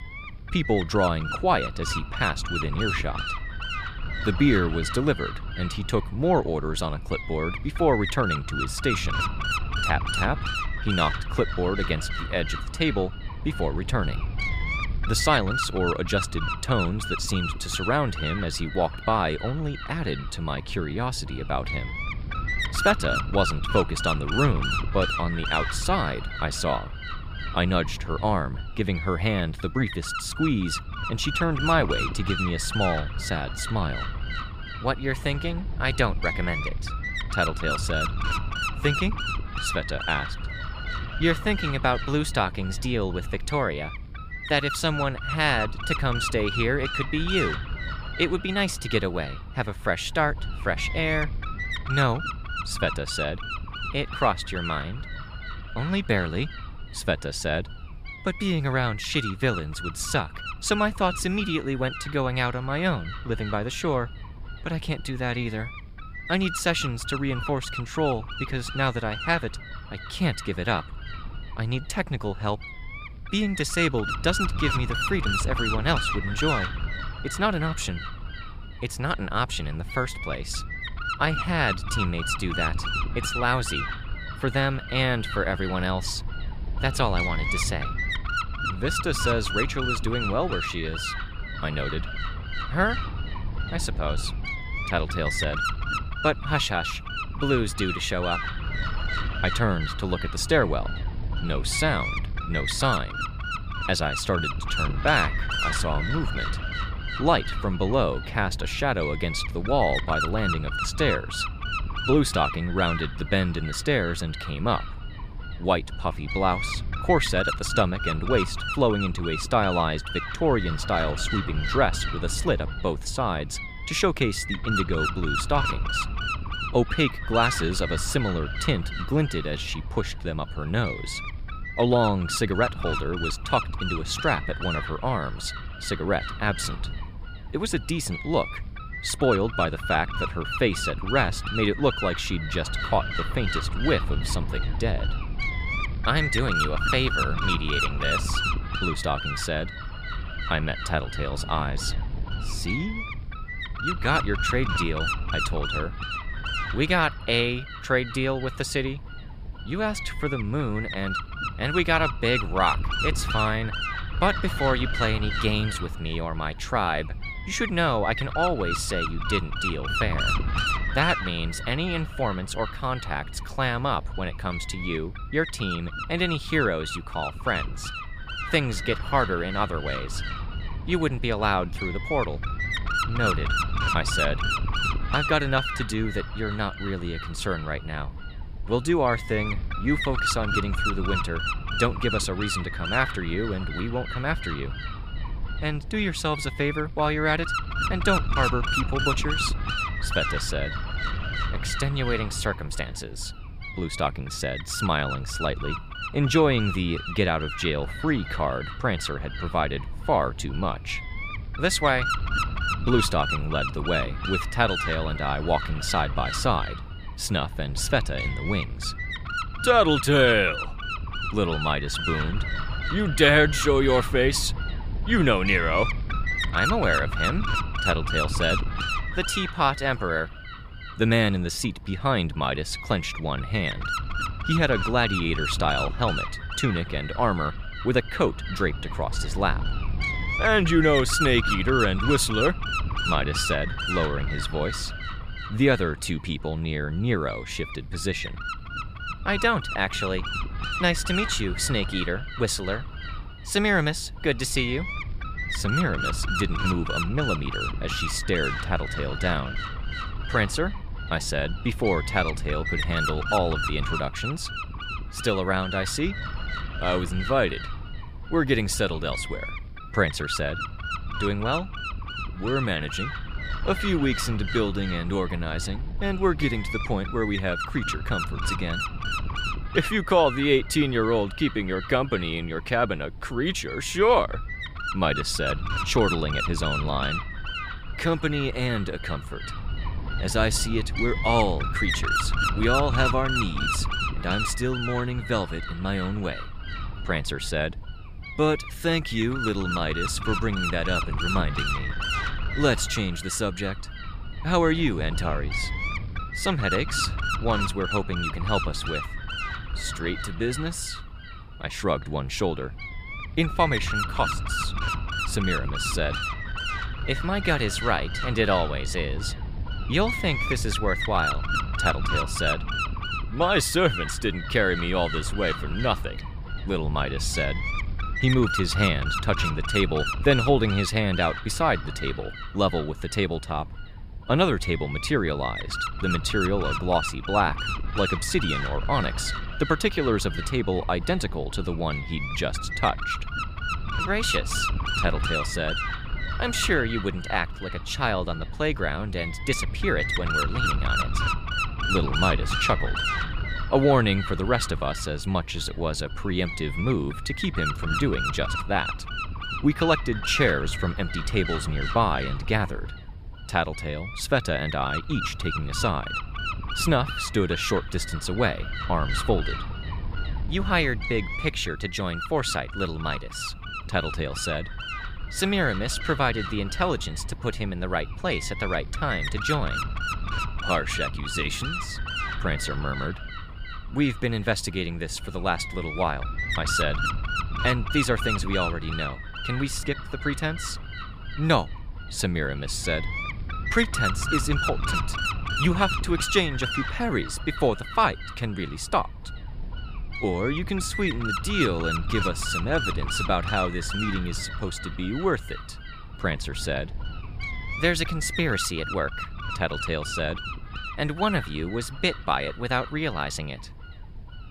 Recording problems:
wind noise on the microphone; heavy; 3 dB below the speech

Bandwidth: 15 kHz